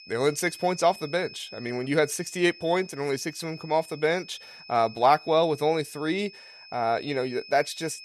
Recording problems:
high-pitched whine; noticeable; throughout; 5 kHz, 20 dB below the speech

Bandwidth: 13.5 kHz